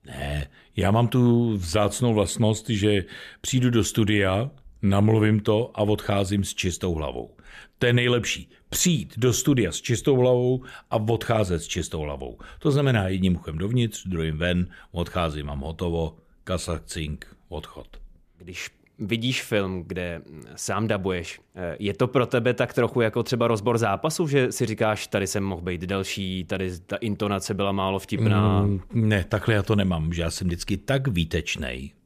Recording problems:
none

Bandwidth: 14.5 kHz